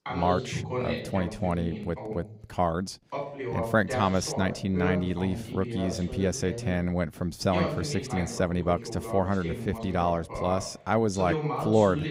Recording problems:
voice in the background; loud; throughout; 6 dB below the speech

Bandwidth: 15.5 kHz